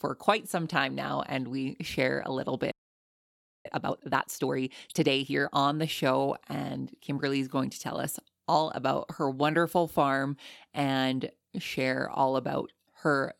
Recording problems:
audio freezing; at 2.5 s for 1 s

